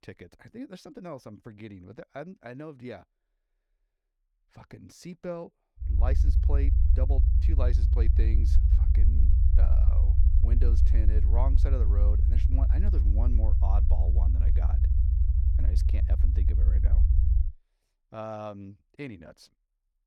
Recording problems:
low rumble; loud; from 6 to 17 s; 2 dB below the speech

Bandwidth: 17.5 kHz